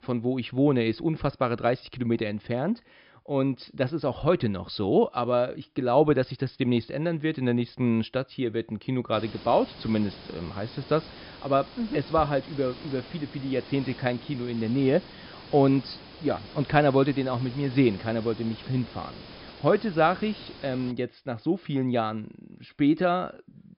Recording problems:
high frequencies cut off; noticeable; nothing above 5.5 kHz
hiss; noticeable; from 9 to 21 s; 15 dB below the speech

